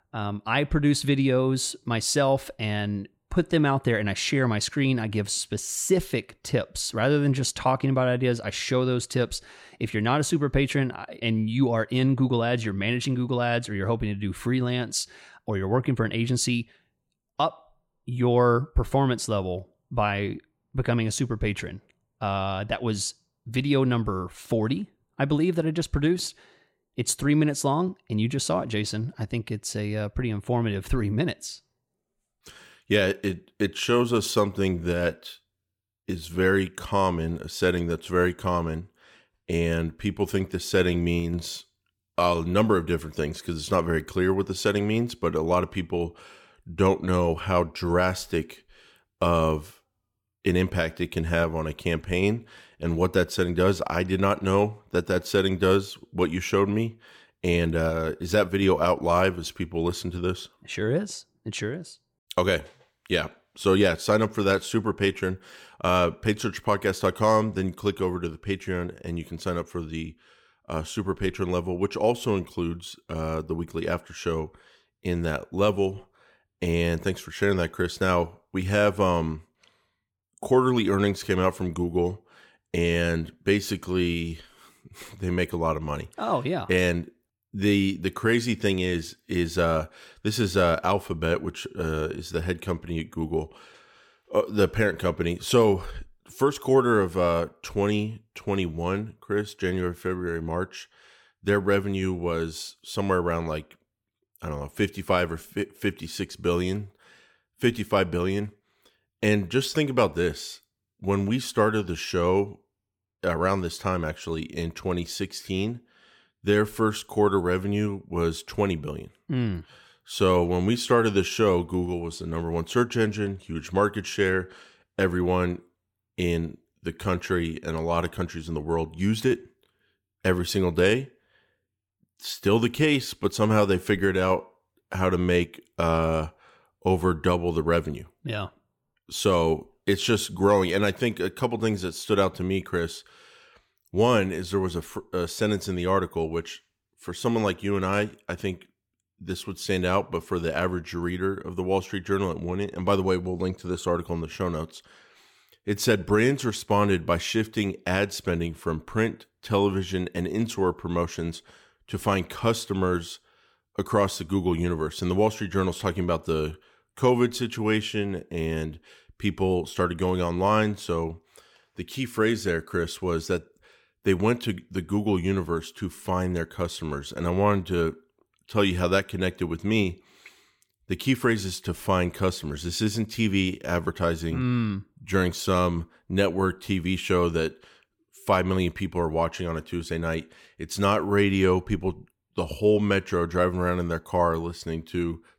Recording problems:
none

